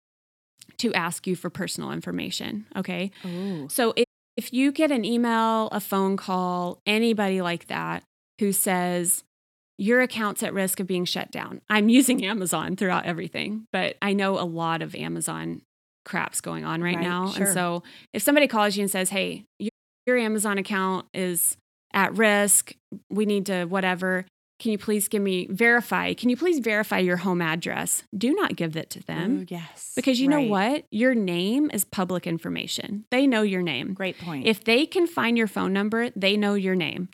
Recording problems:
audio cutting out; at 4 s and at 20 s

